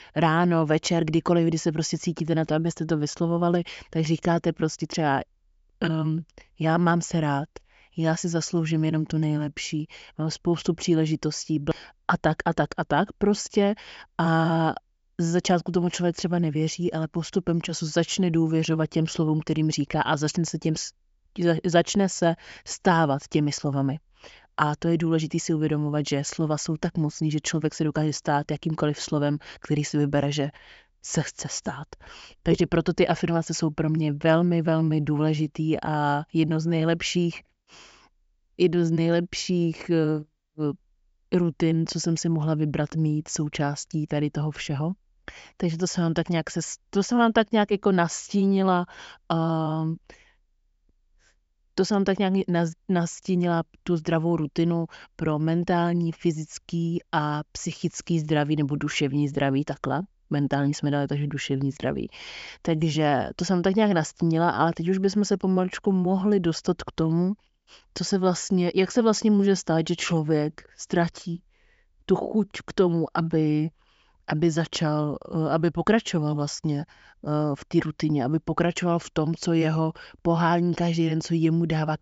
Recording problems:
high frequencies cut off; noticeable; nothing above 8 kHz

